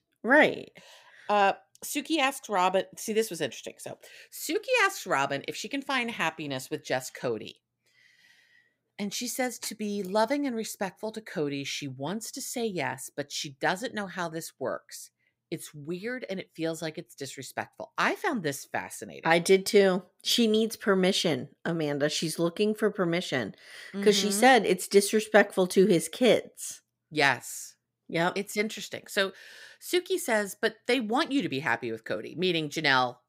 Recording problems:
none

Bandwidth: 15.5 kHz